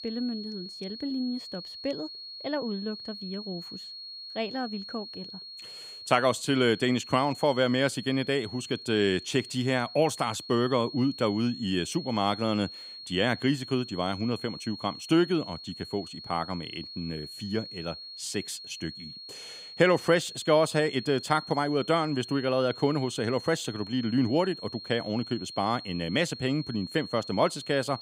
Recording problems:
high-pitched whine; noticeable; throughout; 4.5 kHz, 10 dB below the speech

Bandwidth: 15.5 kHz